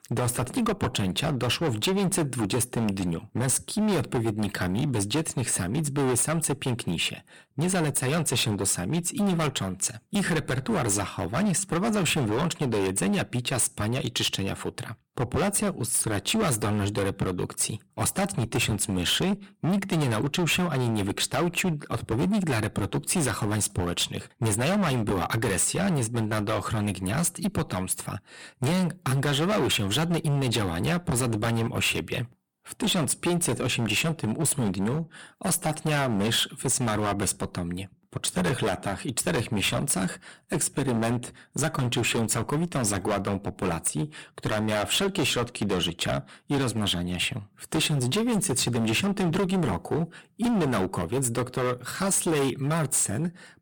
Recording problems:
distortion; heavy; 19% of the sound clipped

